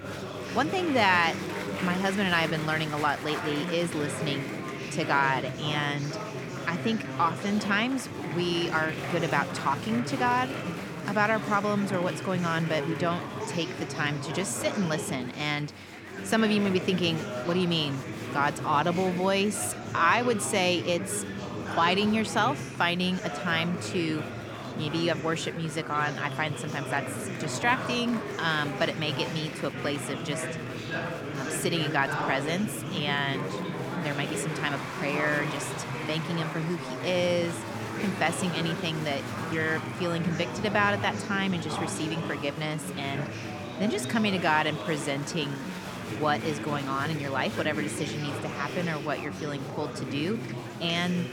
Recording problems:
chatter from many people; loud; throughout; 6 dB below the speech

